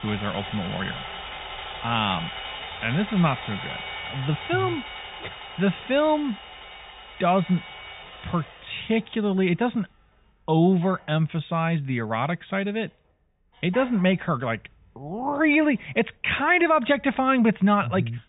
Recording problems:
high frequencies cut off; severe; nothing above 3.5 kHz
machinery noise; noticeable; throughout; 10 dB below the speech

